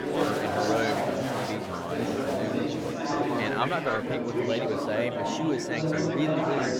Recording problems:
chatter from many people; very loud; throughout; 4 dB above the speech

